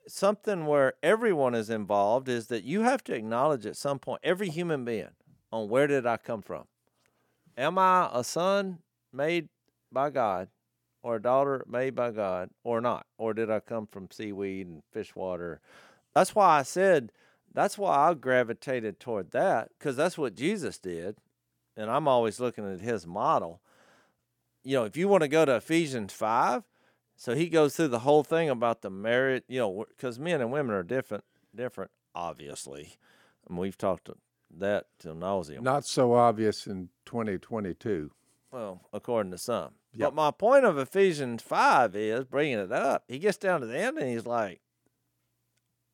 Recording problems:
none

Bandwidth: 18 kHz